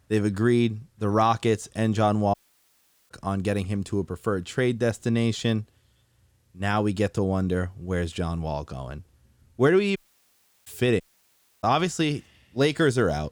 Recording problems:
audio cutting out; at 2.5 s for 1 s, at 10 s for 0.5 s and at 11 s for 0.5 s

